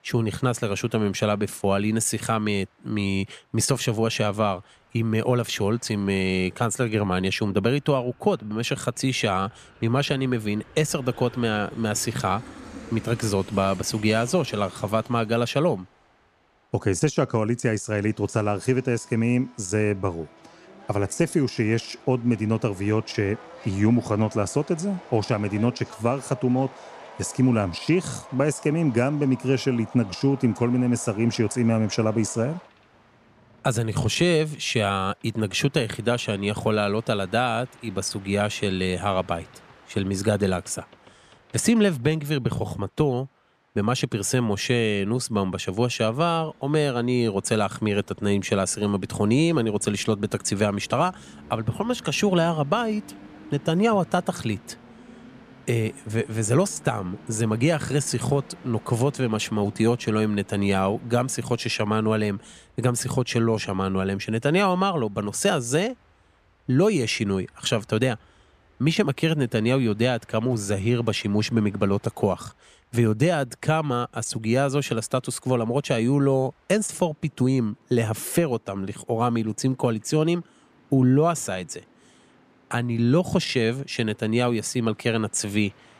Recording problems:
train or aircraft noise; faint; throughout; 25 dB below the speech

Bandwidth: 14.5 kHz